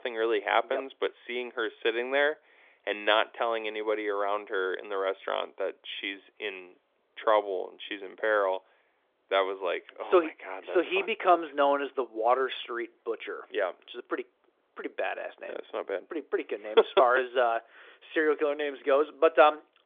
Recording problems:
phone-call audio; nothing above 3.5 kHz

